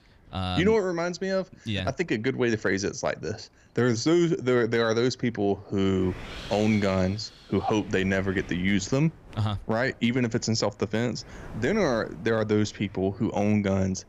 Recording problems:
wind noise on the microphone; occasional gusts; 20 dB below the speech

